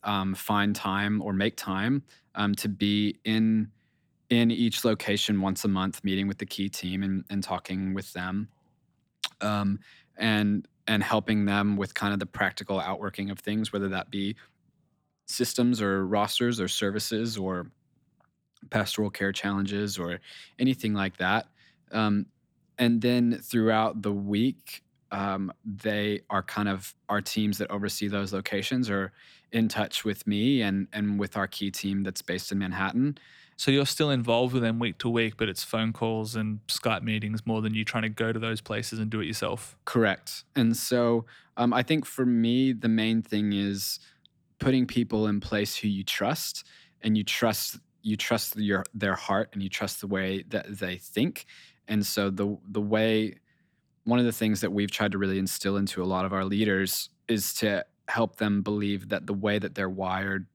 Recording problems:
none

